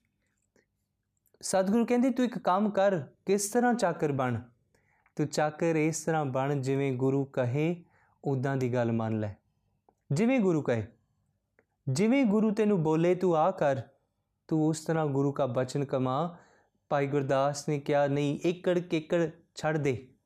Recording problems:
none

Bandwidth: 15 kHz